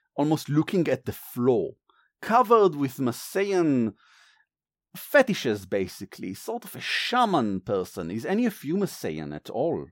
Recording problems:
none

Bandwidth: 16.5 kHz